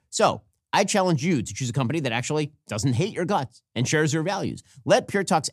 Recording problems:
none

